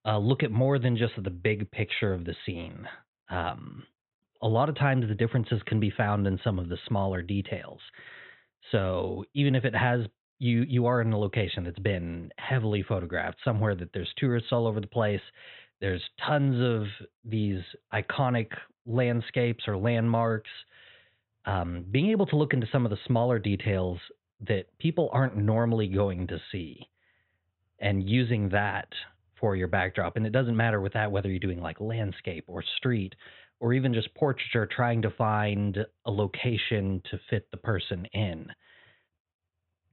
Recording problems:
high frequencies cut off; severe; nothing above 4 kHz

